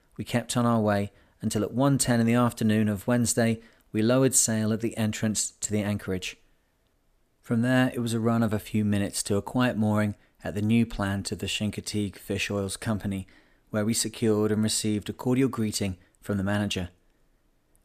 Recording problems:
none

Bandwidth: 14.5 kHz